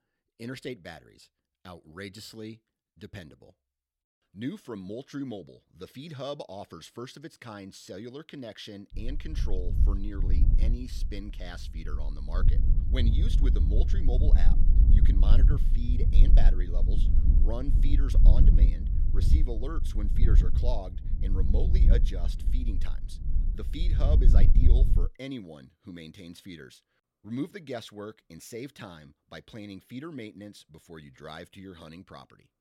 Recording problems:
wind noise on the microphone; heavy; from 9 to 25 s; 3 dB below the speech

